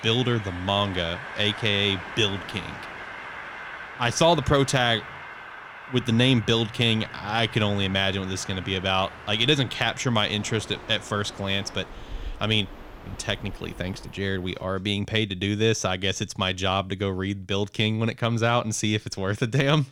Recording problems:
train or aircraft noise; noticeable; until 14 s; 15 dB below the speech

